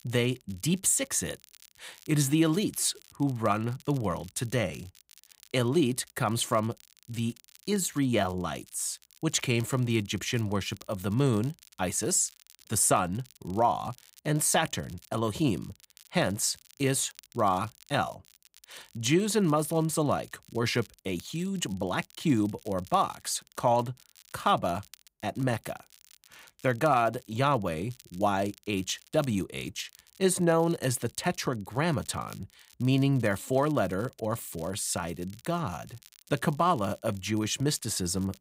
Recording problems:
crackle, like an old record; faint; 25 dB below the speech

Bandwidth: 15.5 kHz